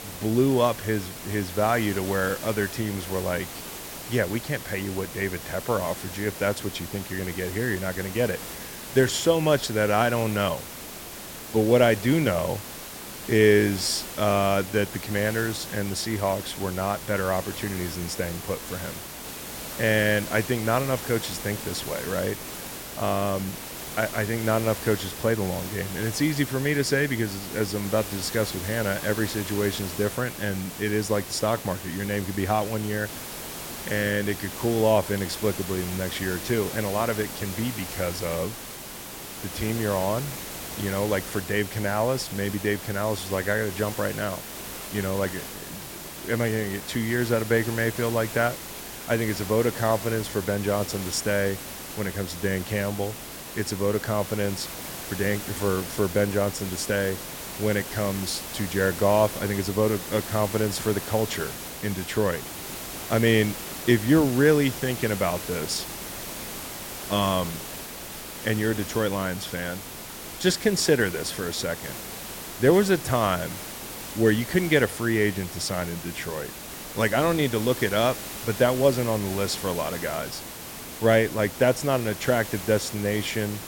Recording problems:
hiss; loud; throughout; 9 dB below the speech

